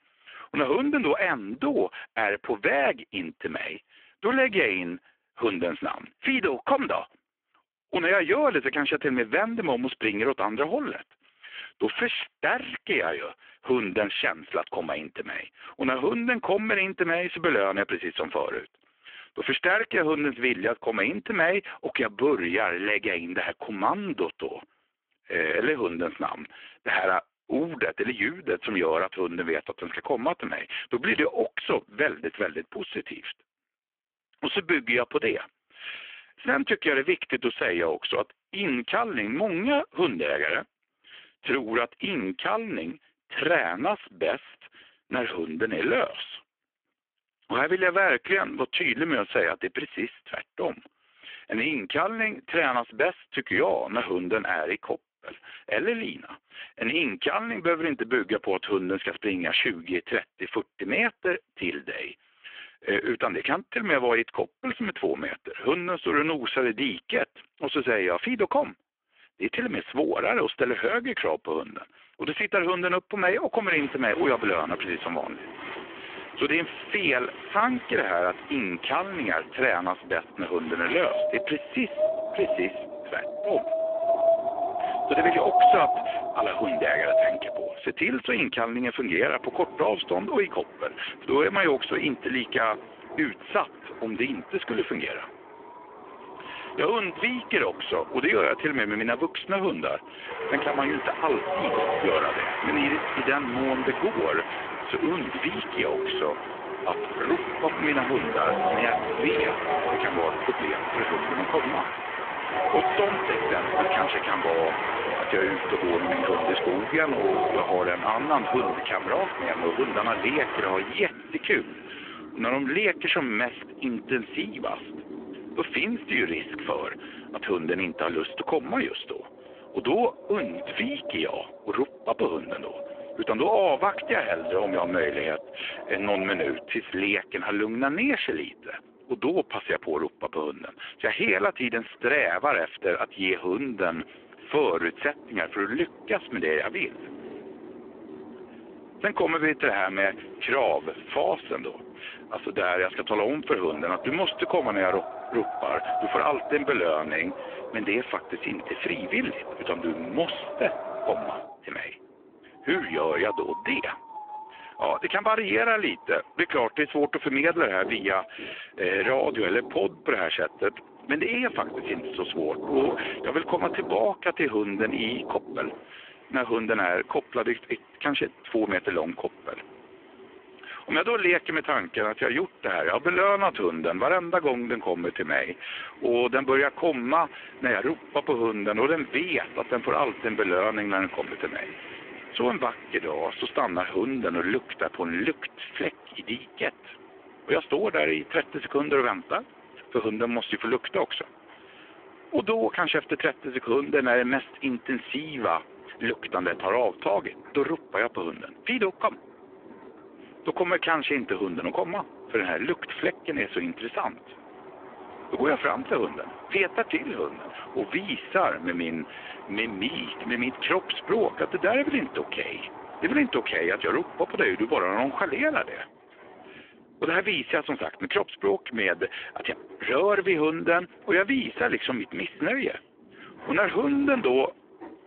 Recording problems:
phone-call audio; poor line
wind in the background; loud; from 1:14 on; 6 dB below the speech

